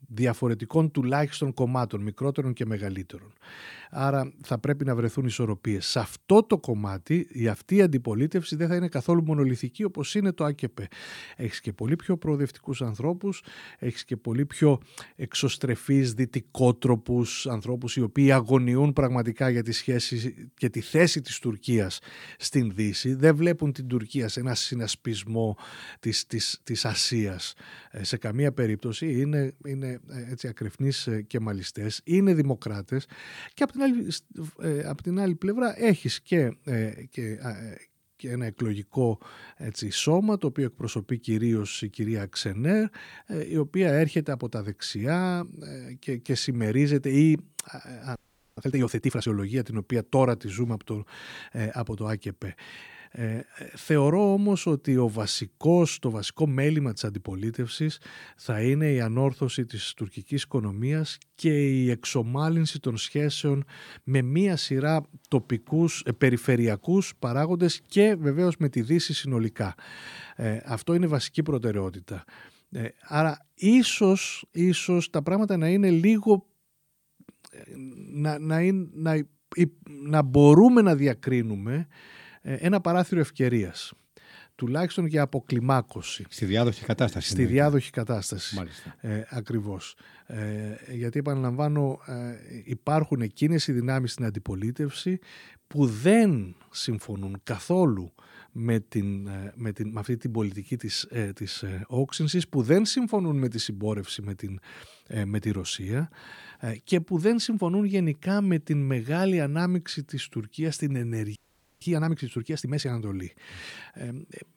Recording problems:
audio freezing; at 48 s and at 1:51

